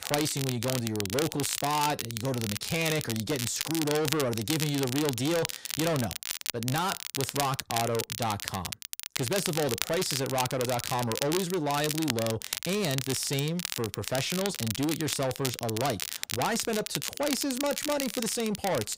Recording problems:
distortion; heavy; 8 dB below the speech
crackle, like an old record; loud; 4 dB below the speech

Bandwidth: 15.5 kHz